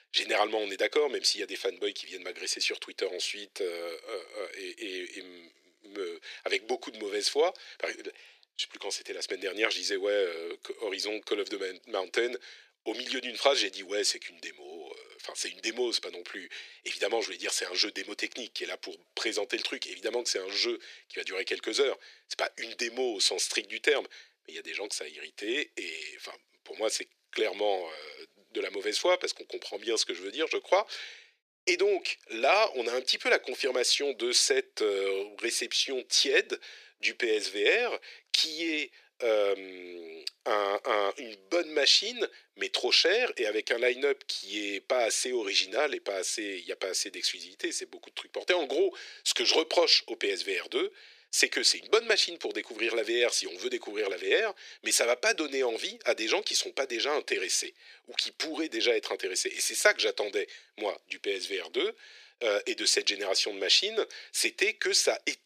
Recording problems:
thin; very; fading below 350 Hz

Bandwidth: 14.5 kHz